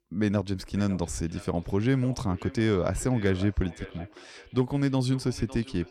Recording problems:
echo of what is said; faint; throughout; 560 ms later, 20 dB below the speech

